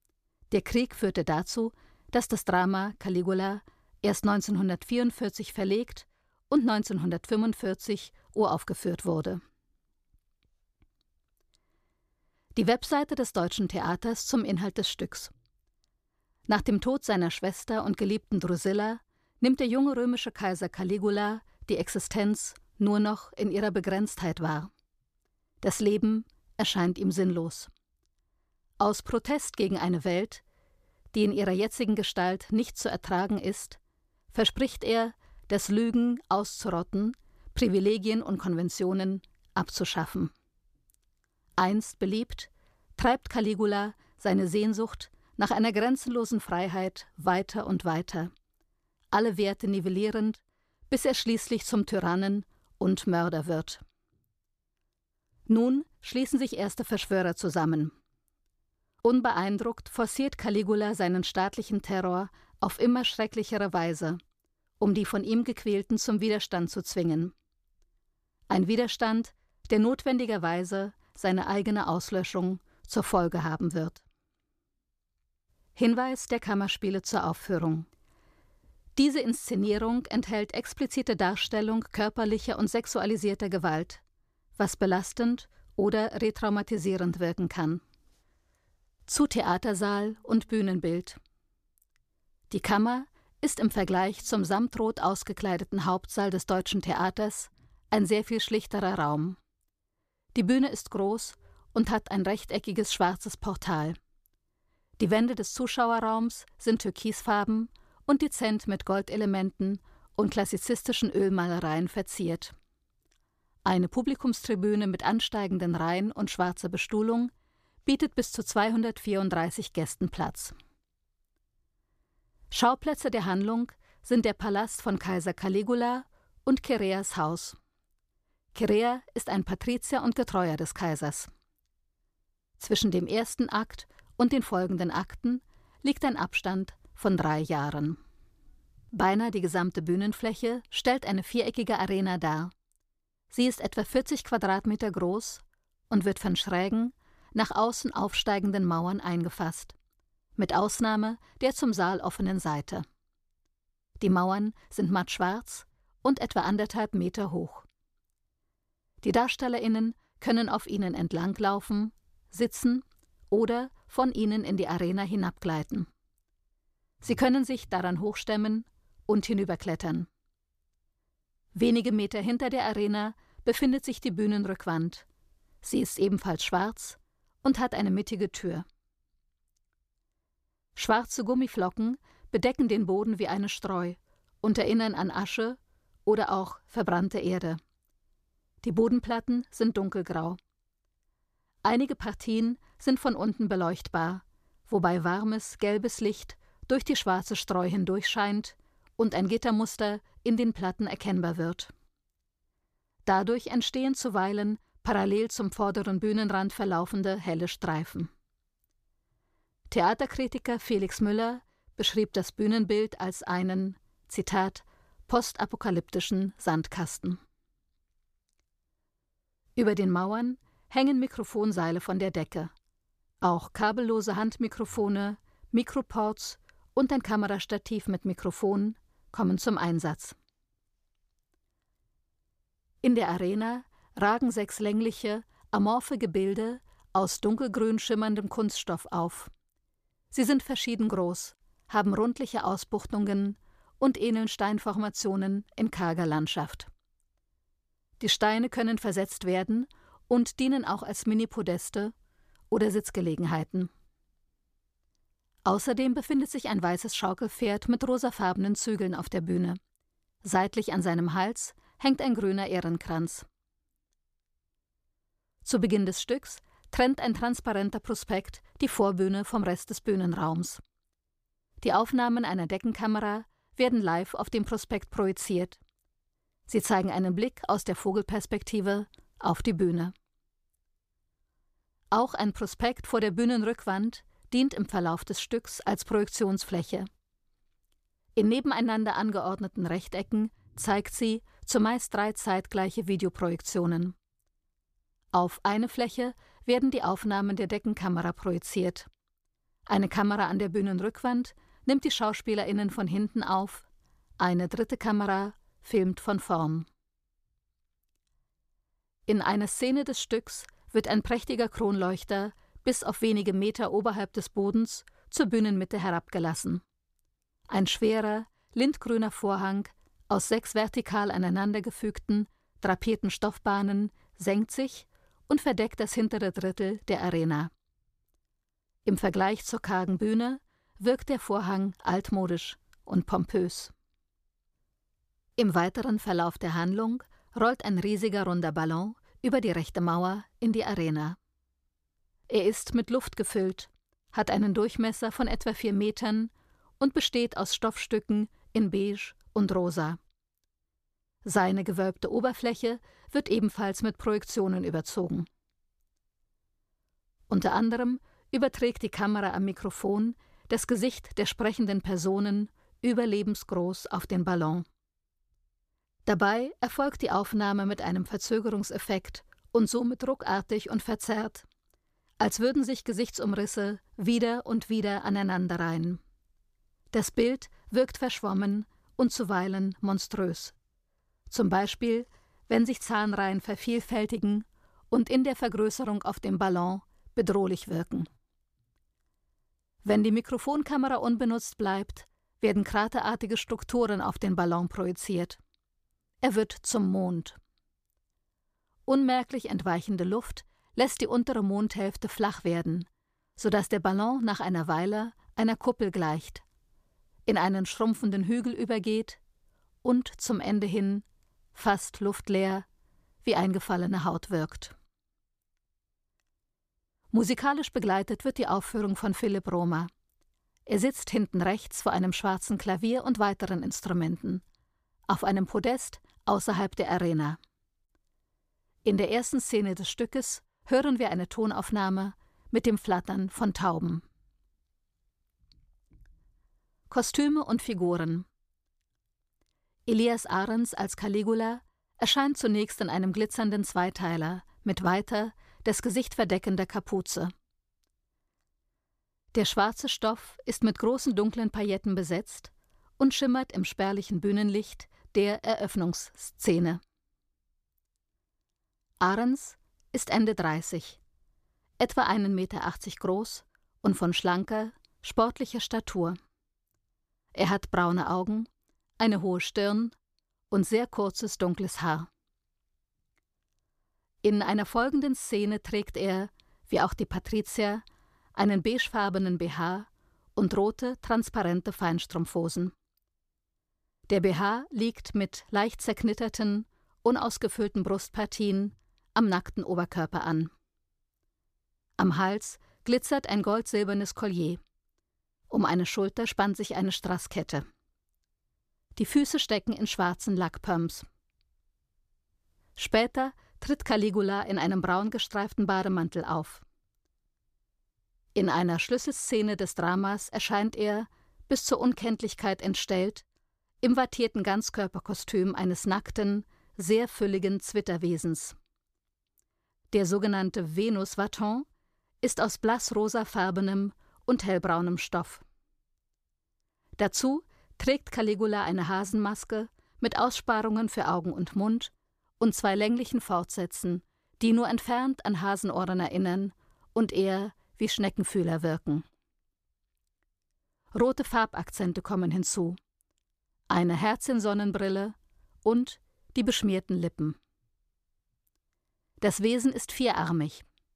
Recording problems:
none

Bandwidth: 14.5 kHz